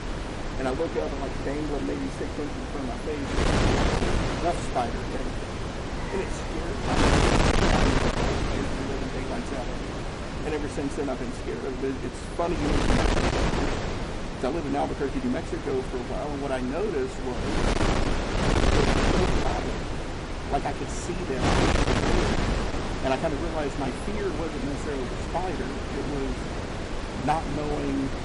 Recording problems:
distortion; slight; 9% of the sound clipped
garbled, watery; slightly; nothing above 10.5 kHz
wind noise on the microphone; heavy; 2 dB above the speech
traffic noise; very faint; throughout; 20 dB below the speech

